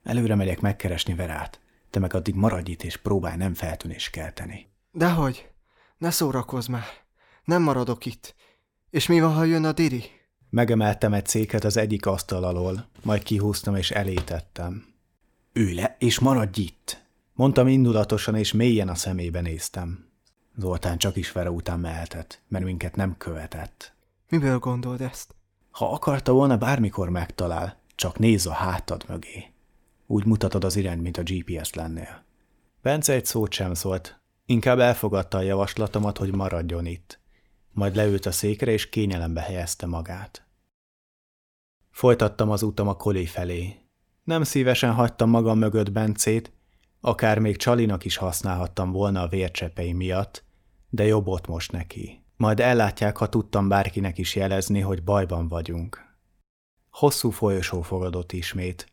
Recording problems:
none

